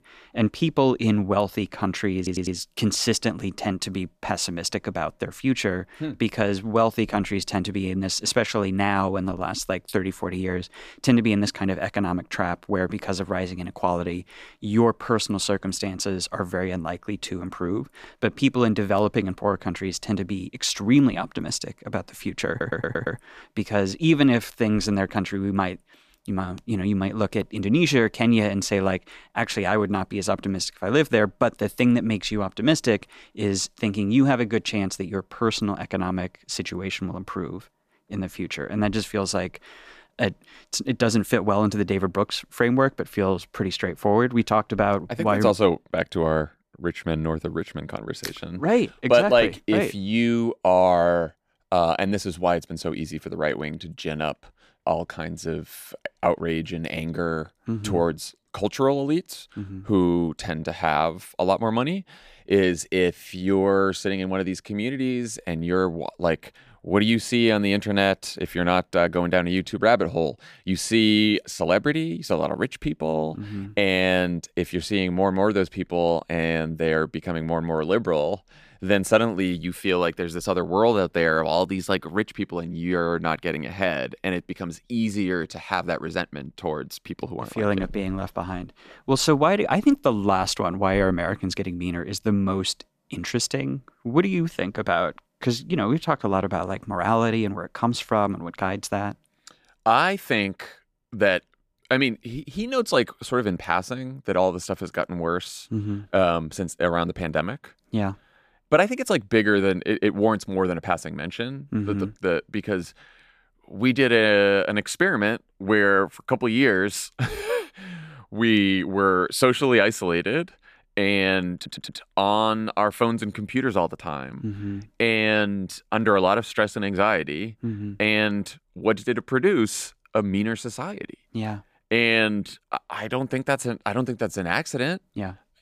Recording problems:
audio stuttering; at 2 s, at 22 s and at 2:02

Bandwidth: 14.5 kHz